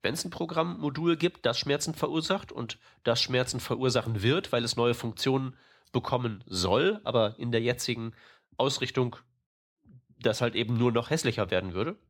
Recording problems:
none

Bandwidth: 17 kHz